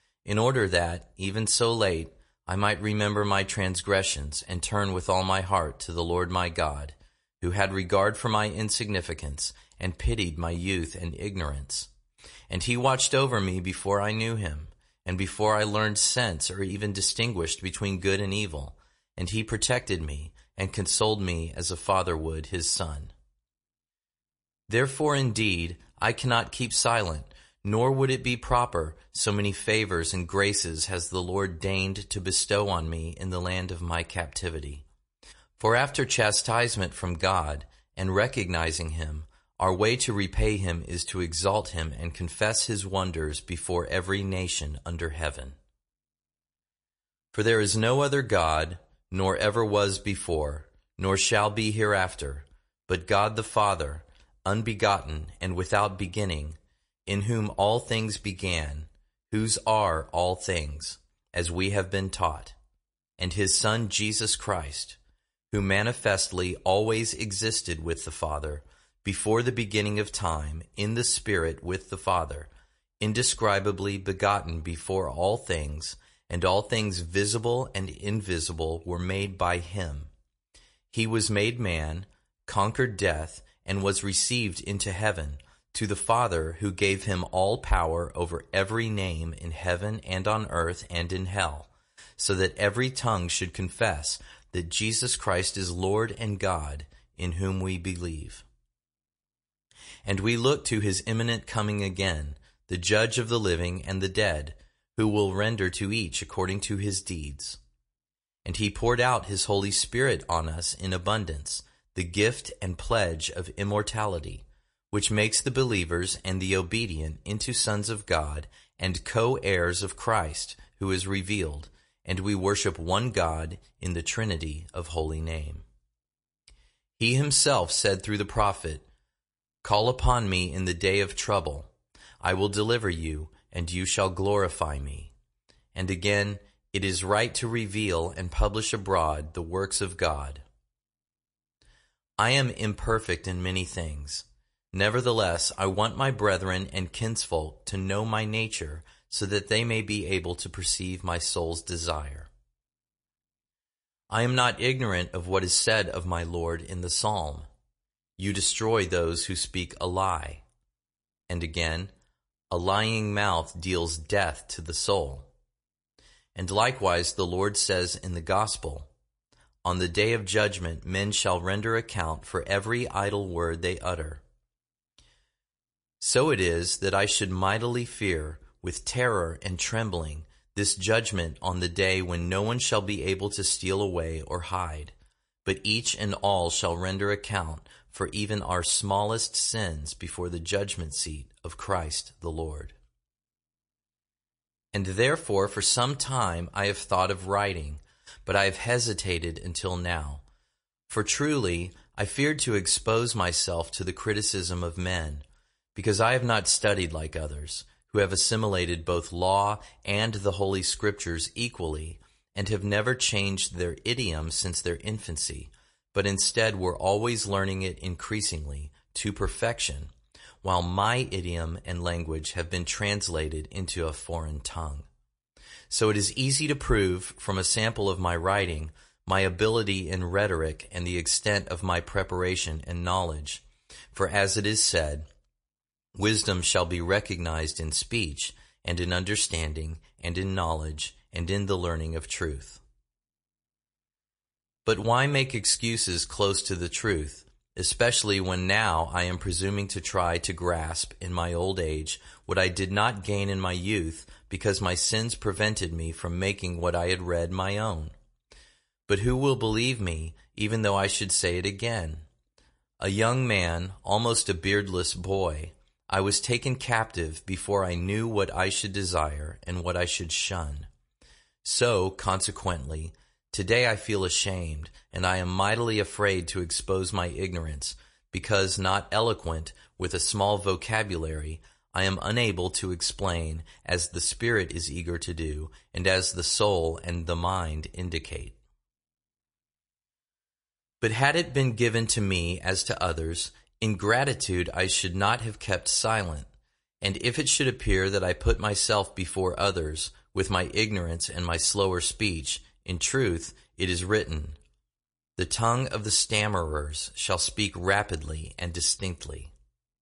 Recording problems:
garbled, watery; slightly; nothing above 10.5 kHz

